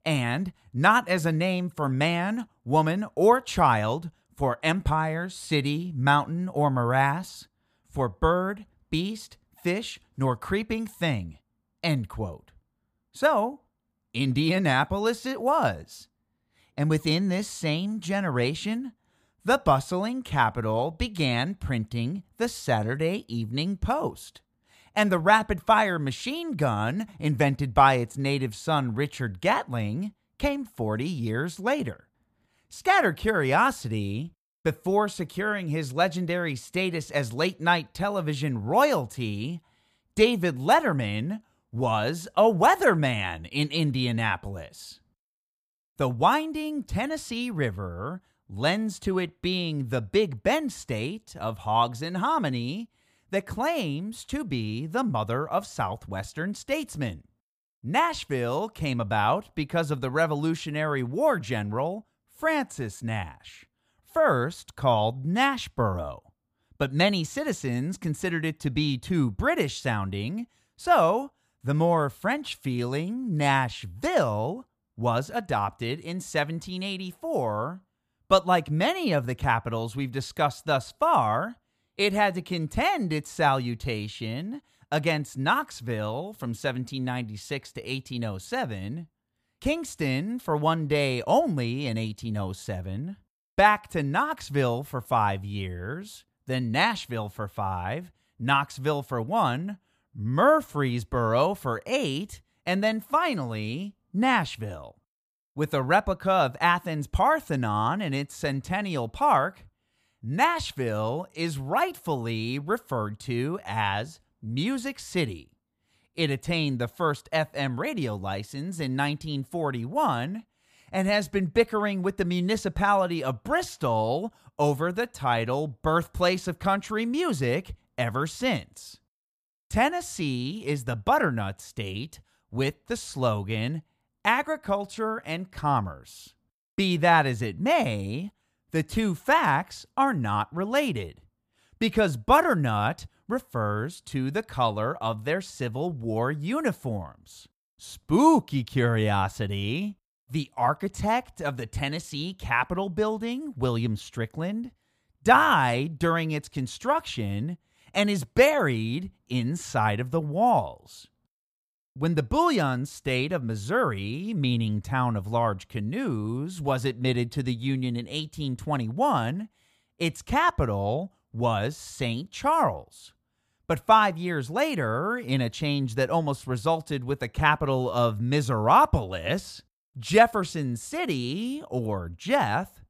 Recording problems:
none

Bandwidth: 15 kHz